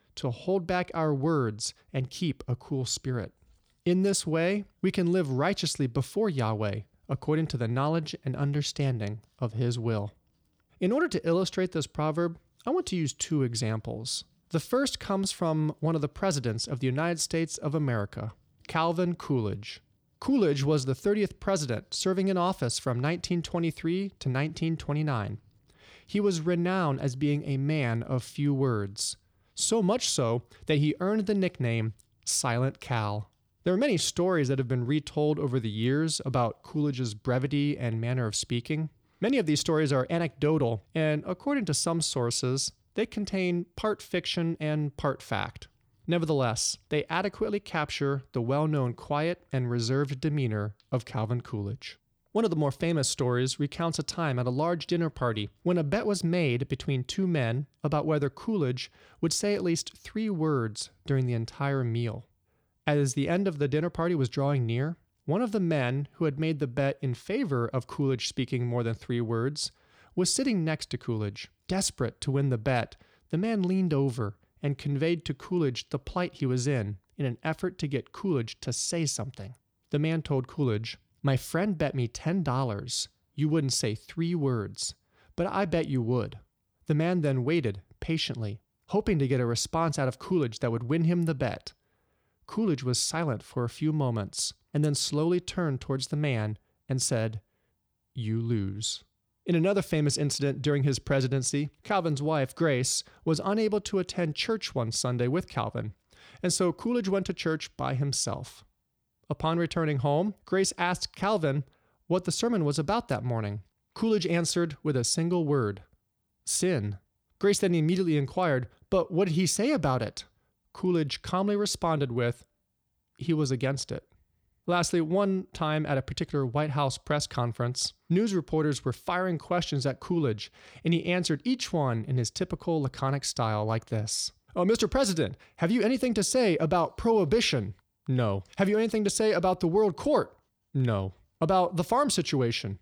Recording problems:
none

